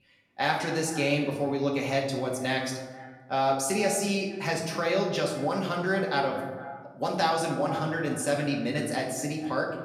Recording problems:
off-mic speech; far
echo of what is said; noticeable; throughout; 230 ms later, 15 dB below the speech
room echo; noticeable; dies away in 0.9 s

